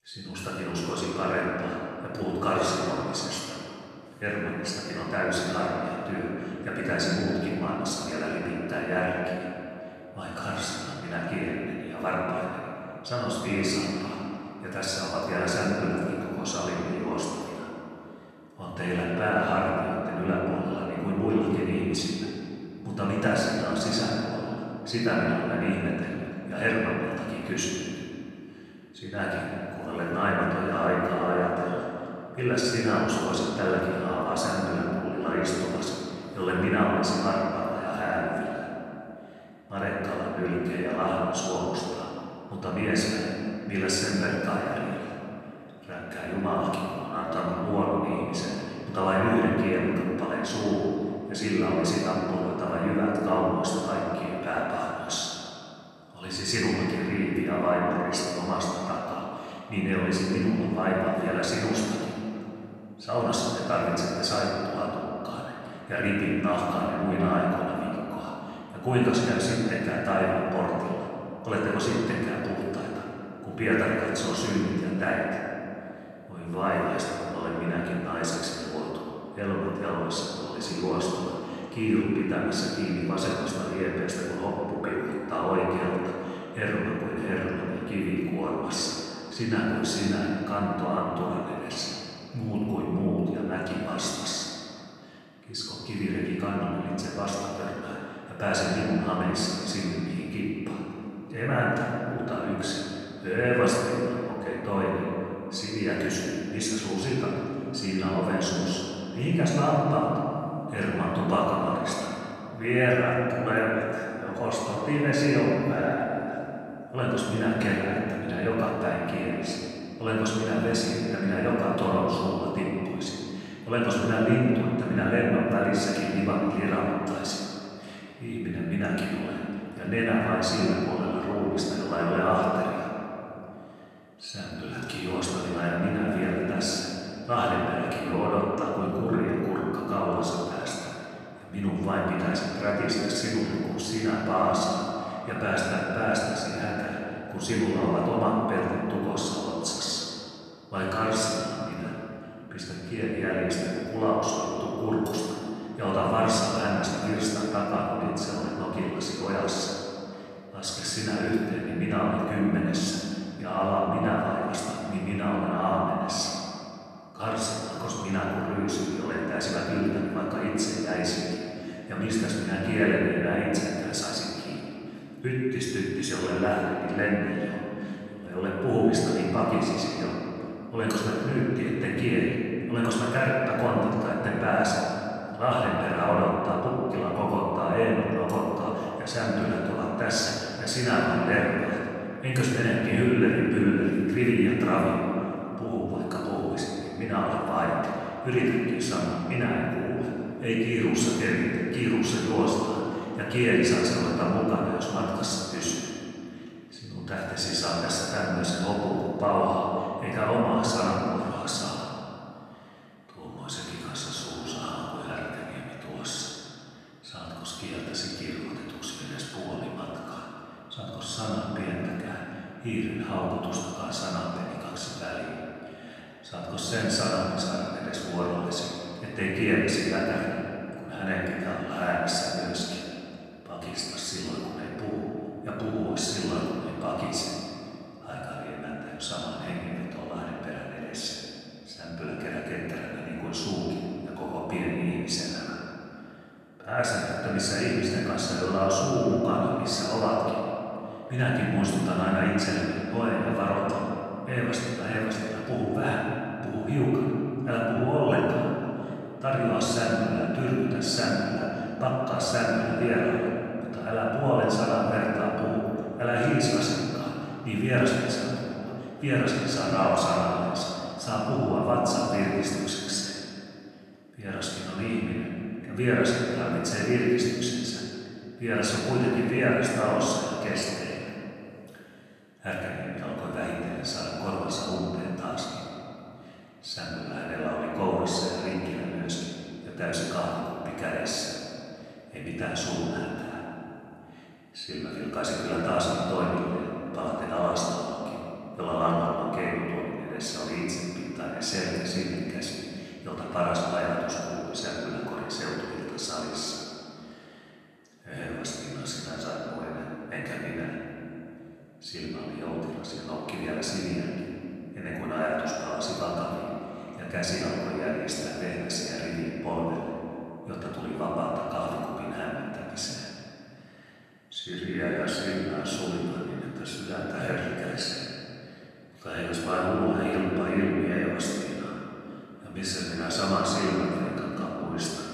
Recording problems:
room echo; strong; dies away in 2.6 s
off-mic speech; far

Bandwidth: 13.5 kHz